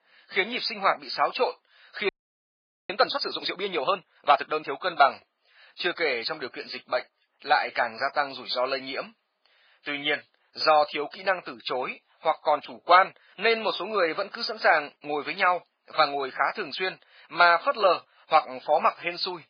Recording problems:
garbled, watery; badly; nothing above 4.5 kHz
thin; very; fading below 650 Hz
audio freezing; at 2 s for 1 s

